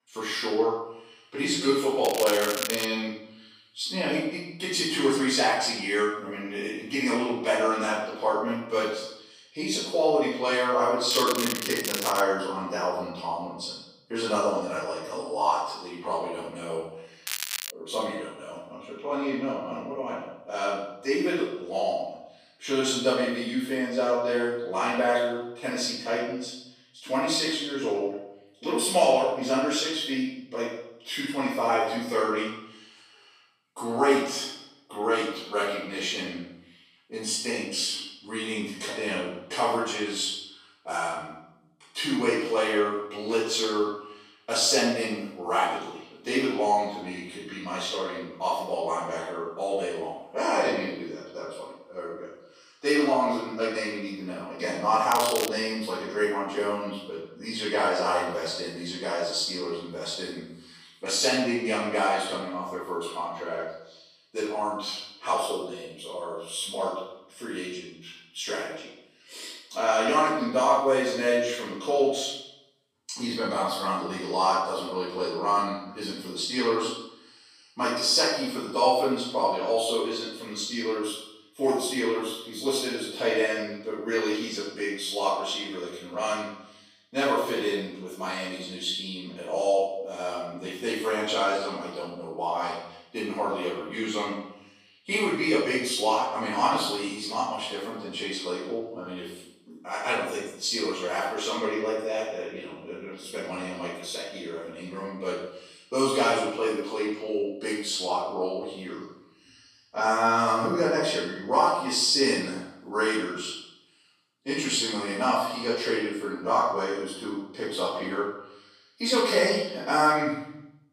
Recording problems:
room echo; strong; dies away in 0.7 s
off-mic speech; far
thin; somewhat; fading below 450 Hz
crackling; loud; 4 times, first at 2 s; 4 dB below the speech

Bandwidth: 15.5 kHz